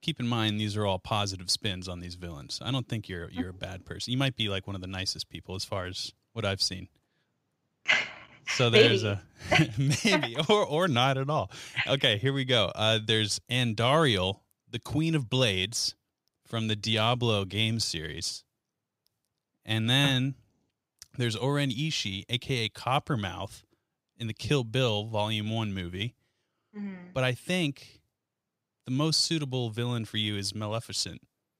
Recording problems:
none

